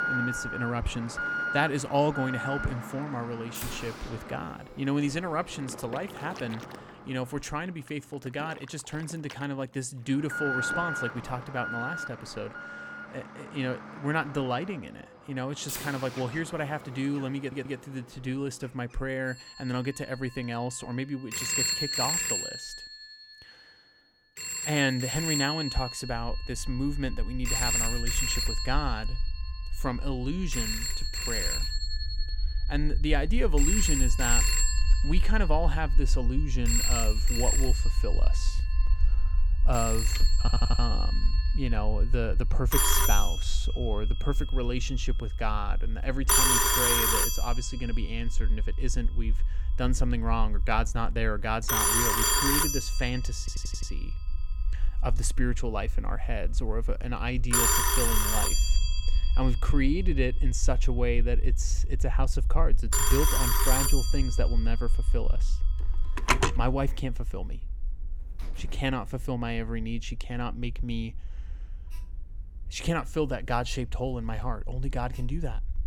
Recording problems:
alarms or sirens; very loud; throughout; 4 dB above the speech
low rumble; faint; from 26 s on; 20 dB below the speech
audio stuttering; at 17 s, at 40 s and at 53 s

